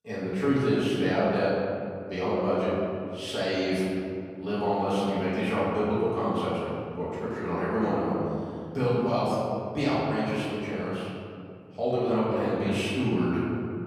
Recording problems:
room echo; strong; dies away in 2.5 s
off-mic speech; far

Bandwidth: 15 kHz